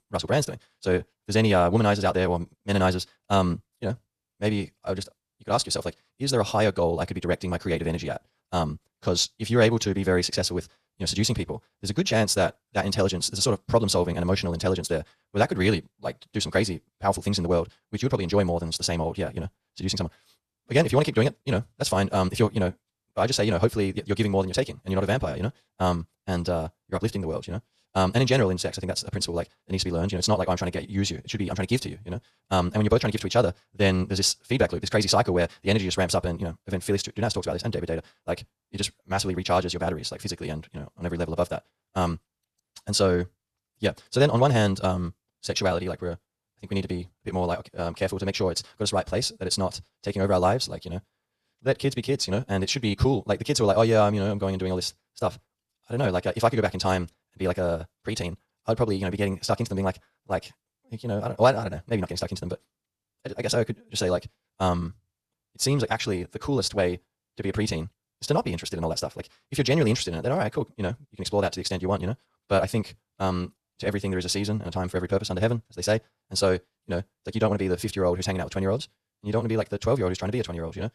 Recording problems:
wrong speed, natural pitch; too fast; 1.8 times normal speed

